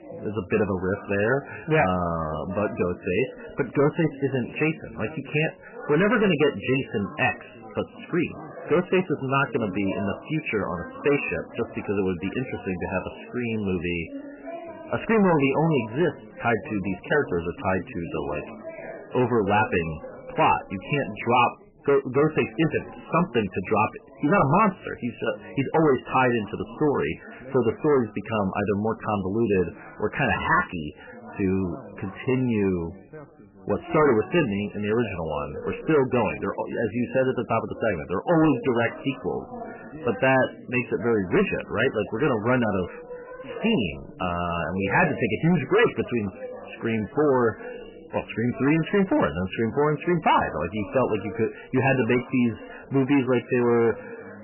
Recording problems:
distortion; heavy; 7% of the sound clipped
garbled, watery; badly; nothing above 3 kHz
background chatter; noticeable; throughout; 4 voices, 15 dB below the speech

